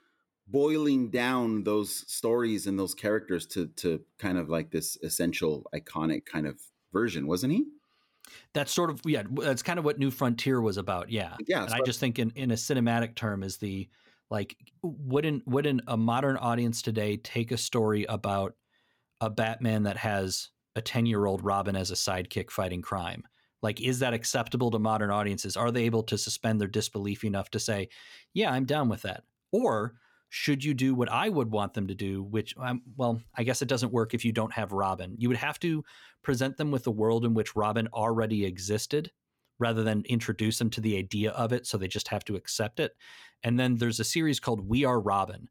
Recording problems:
none

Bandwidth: 17.5 kHz